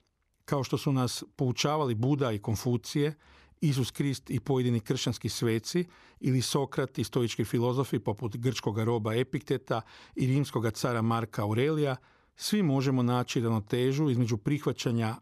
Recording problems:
none

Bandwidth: 14 kHz